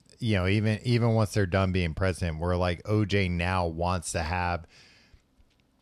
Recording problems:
none

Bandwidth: 13.5 kHz